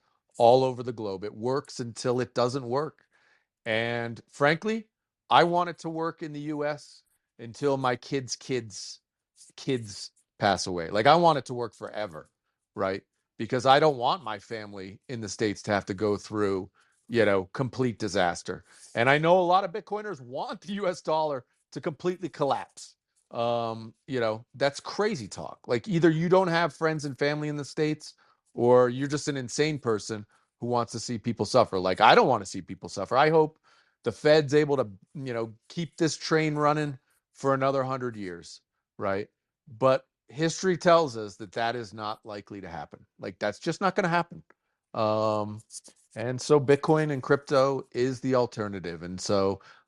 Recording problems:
none

